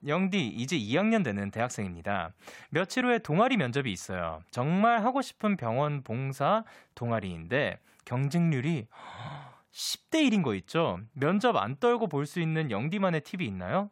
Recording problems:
none

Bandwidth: 16 kHz